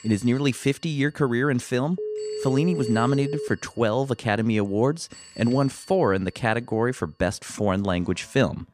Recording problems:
alarms or sirens; faint; throughout; 20 dB below the speech
phone ringing; noticeable; from 2 to 3.5 s; peak 6 dB below the speech

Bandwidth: 14.5 kHz